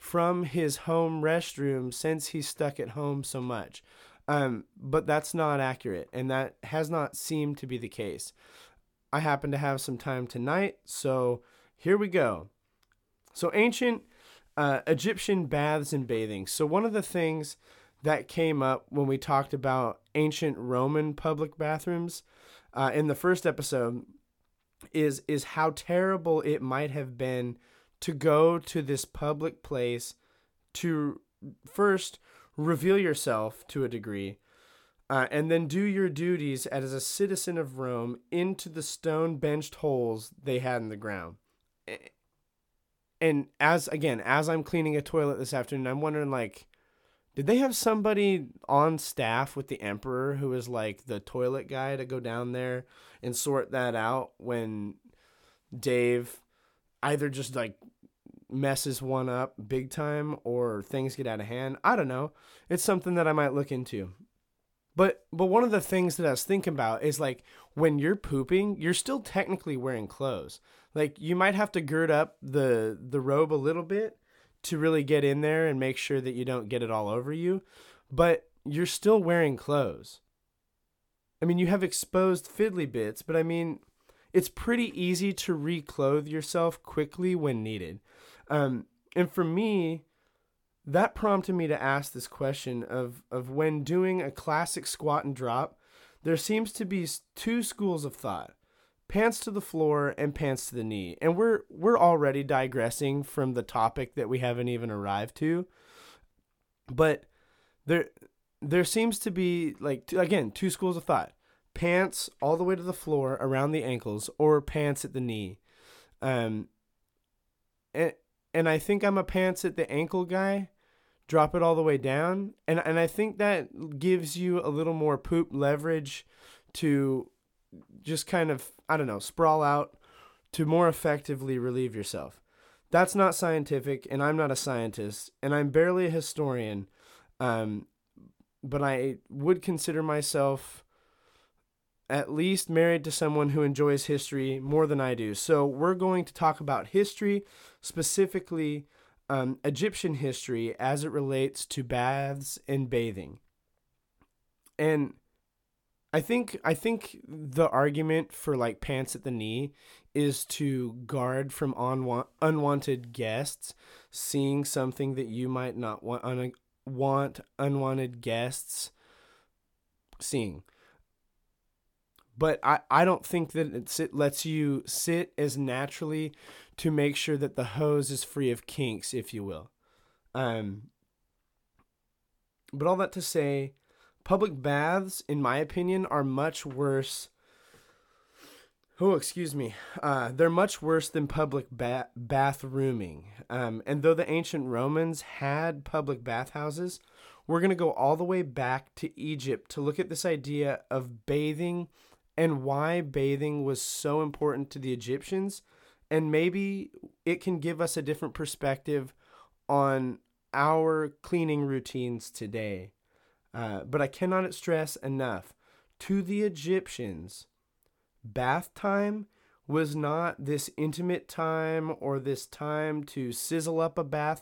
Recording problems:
none

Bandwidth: 17.5 kHz